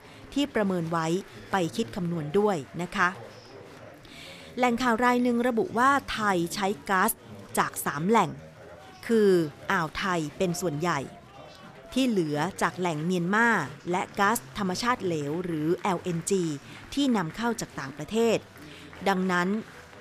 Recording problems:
chatter from many people; noticeable; throughout; 20 dB below the speech

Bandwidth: 14.5 kHz